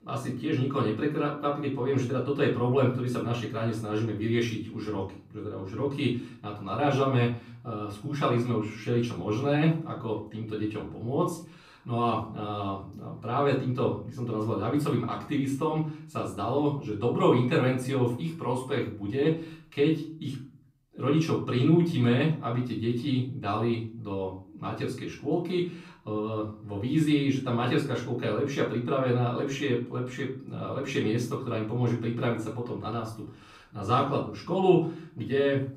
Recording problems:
off-mic speech; far
room echo; slight; dies away in 0.4 s

